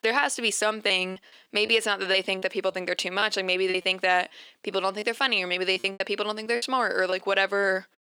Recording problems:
thin; somewhat; fading below 350 Hz
choppy; very; 7% of the speech affected

